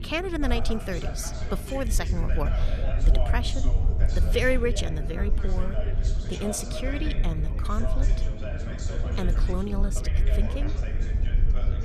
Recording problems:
background chatter; loud; throughout; 3 voices, 8 dB below the speech
wind noise on the microphone; occasional gusts; 15 dB below the speech
low rumble; noticeable; throughout; 15 dB below the speech

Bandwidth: 14 kHz